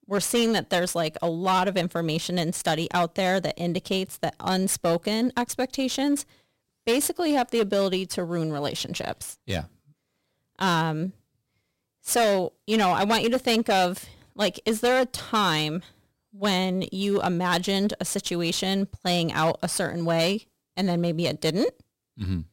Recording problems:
distortion; slight; 5% of the sound clipped

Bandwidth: 16 kHz